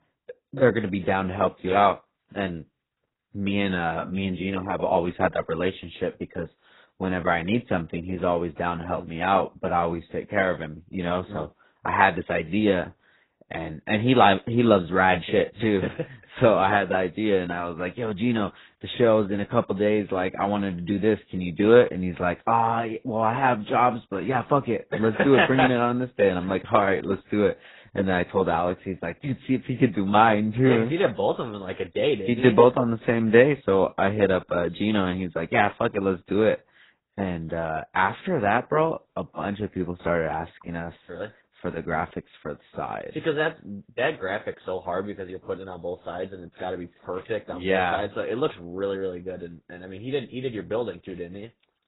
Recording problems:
garbled, watery; badly; nothing above 4 kHz

